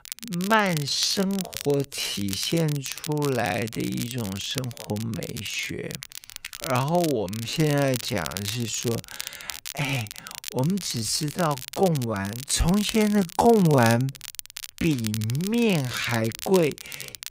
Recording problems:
wrong speed, natural pitch; too slow; 0.5 times normal speed
crackle, like an old record; noticeable; 10 dB below the speech

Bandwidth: 15.5 kHz